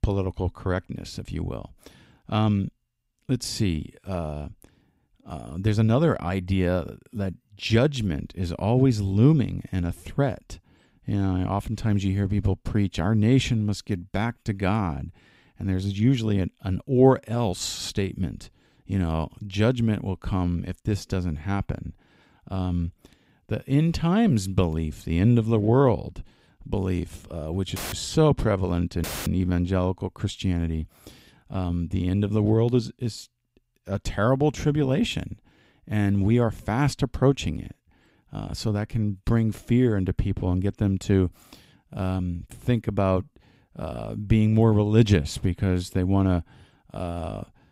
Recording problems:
audio cutting out; filled with static; at 28 s and at 29 s

